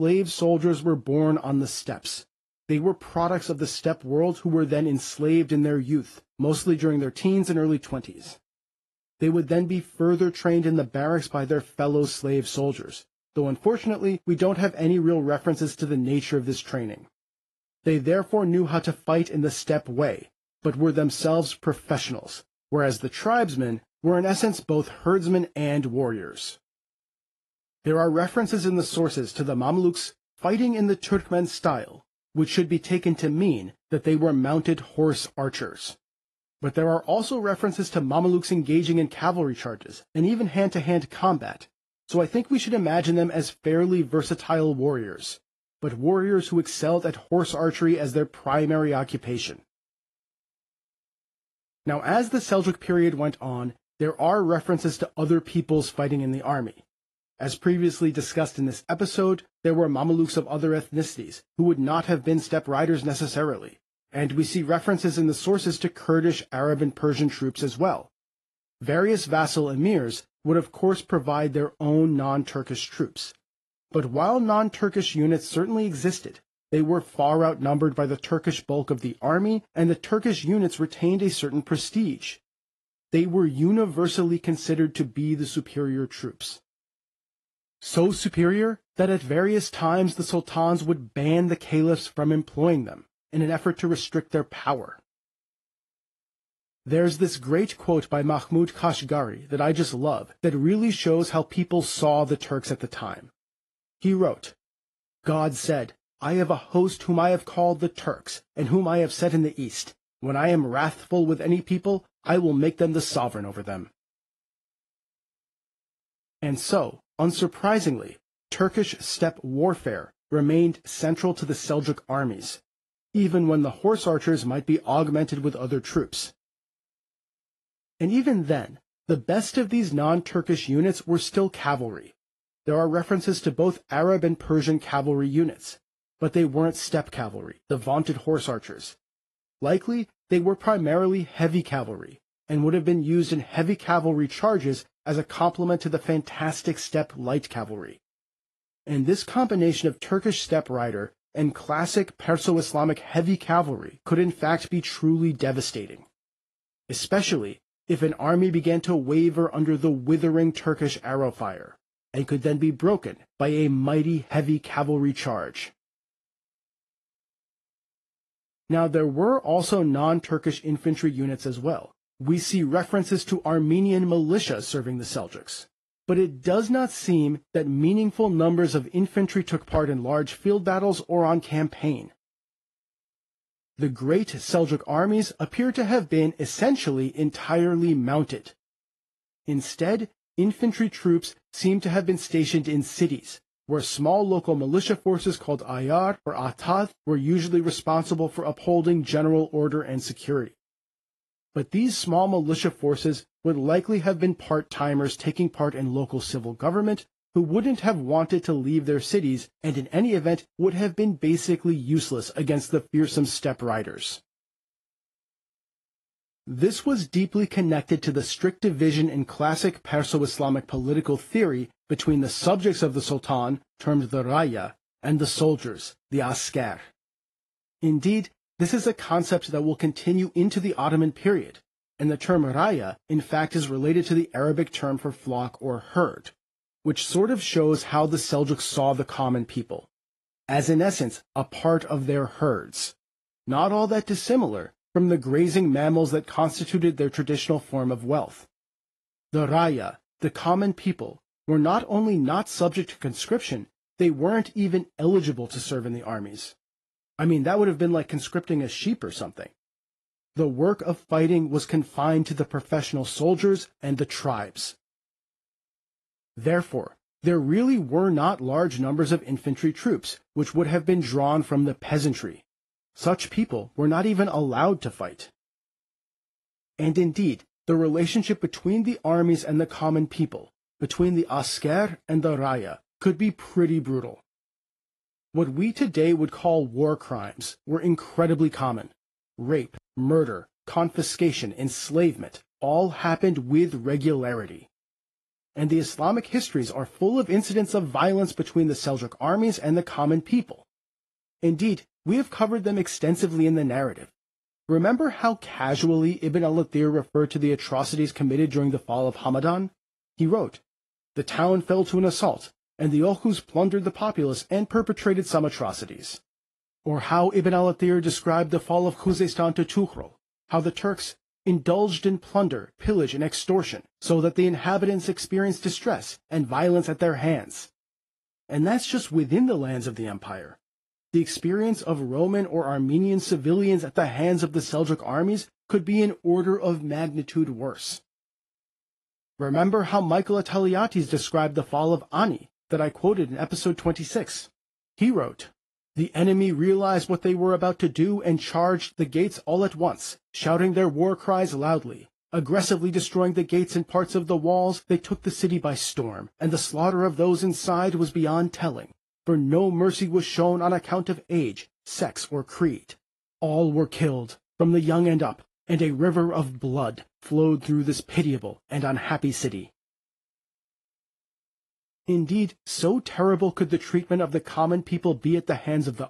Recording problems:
garbled, watery; slightly; nothing above 11.5 kHz
abrupt cut into speech; at the start

